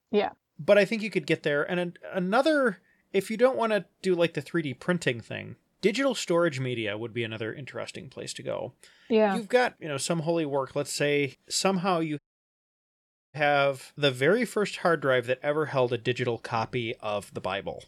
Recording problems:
audio cutting out; at 12 s for 1 s

